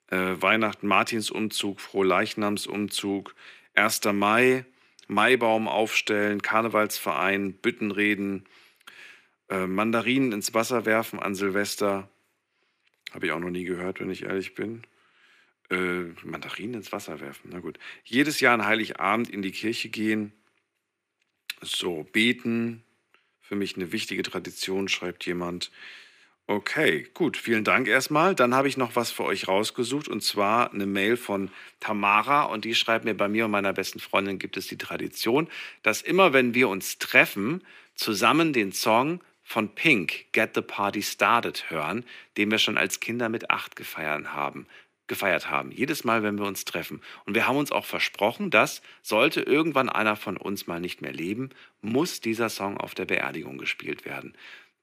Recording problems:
thin; somewhat; fading below 350 Hz

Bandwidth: 15 kHz